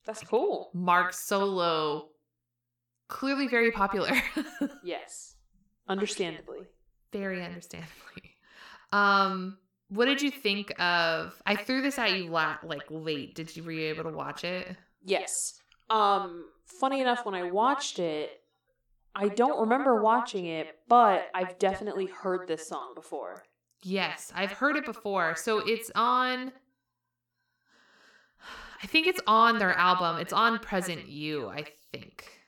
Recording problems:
echo of what is said; strong; throughout; 80 ms later, 9 dB below the speech

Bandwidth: 18.5 kHz